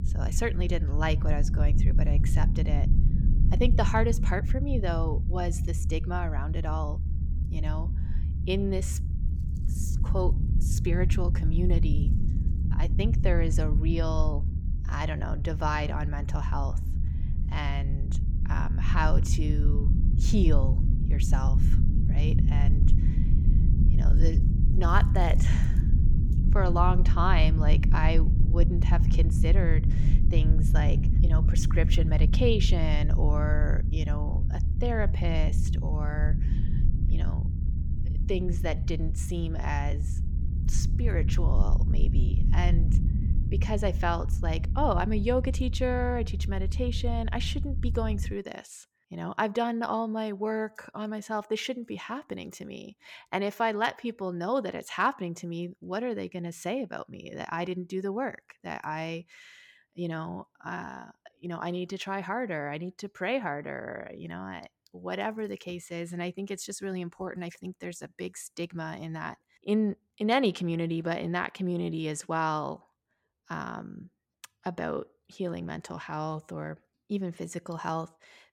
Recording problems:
low rumble; loud; until 48 s; 9 dB below the speech

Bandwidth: 17.5 kHz